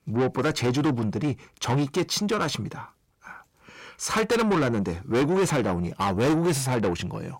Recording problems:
distortion; heavy; 6 dB below the speech

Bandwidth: 16 kHz